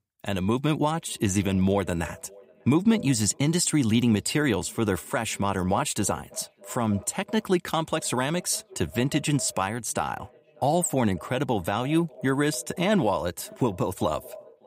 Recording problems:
echo of what is said; faint; throughout; 590 ms later, 20 dB below the speech

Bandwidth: 15.5 kHz